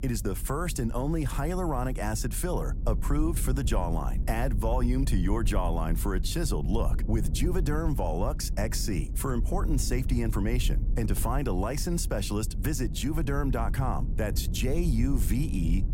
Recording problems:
low rumble; noticeable; throughout; 15 dB below the speech

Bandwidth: 16 kHz